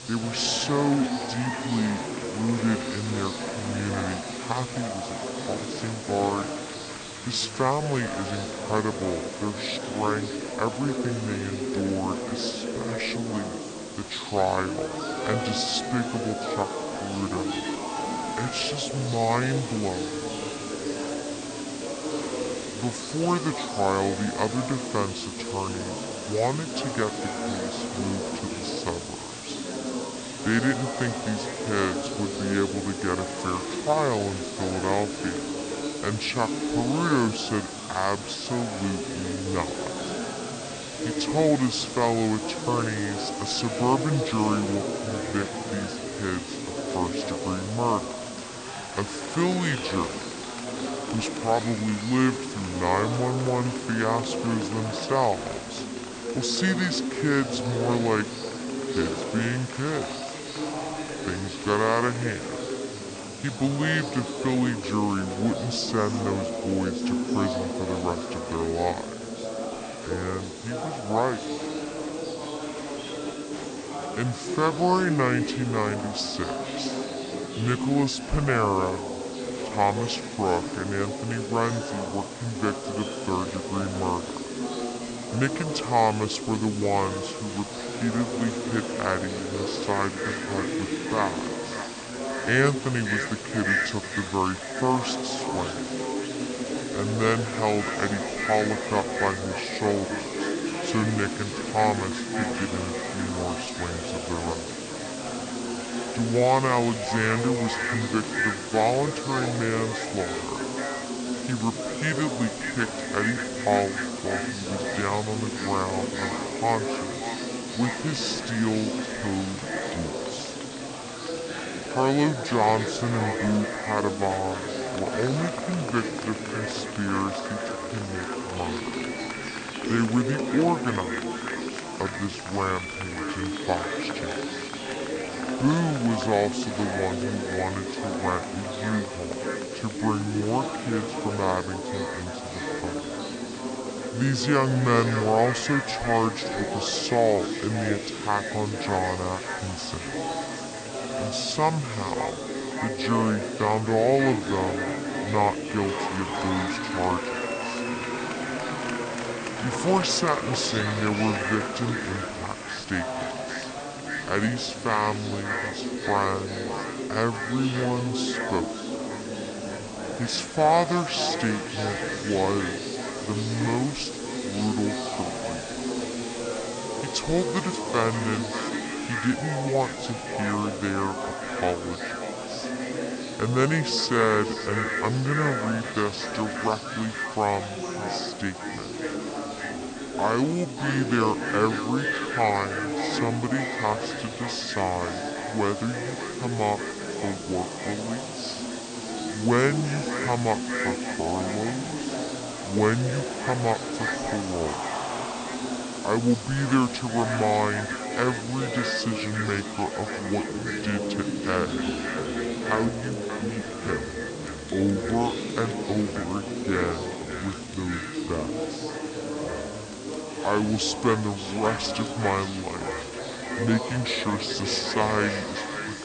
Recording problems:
echo of what is said; strong; from 1:30 on; 580 ms later, 8 dB below the speech
wrong speed and pitch; too slow and too low; 0.6 times normal speed
chatter from many people; loud; throughout; 5 dB below the speech
hiss; noticeable; throughout; 10 dB below the speech

